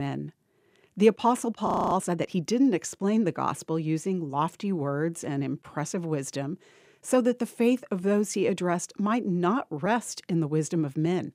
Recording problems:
abrupt cut into speech; at the start
audio freezing; at 1.5 s

